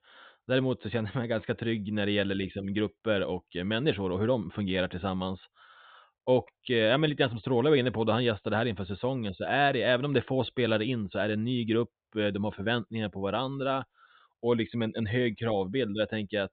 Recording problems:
high frequencies cut off; severe; nothing above 4 kHz

